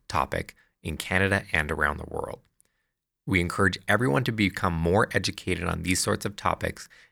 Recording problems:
none

